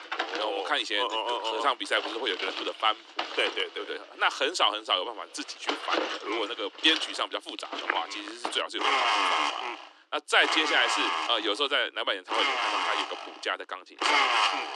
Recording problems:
thin; very; fading below 300 Hz
household noises; loud; throughout; as loud as the speech

